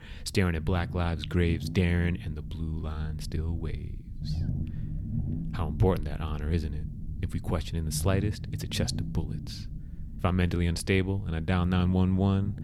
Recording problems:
low rumble; noticeable; throughout; 15 dB below the speech

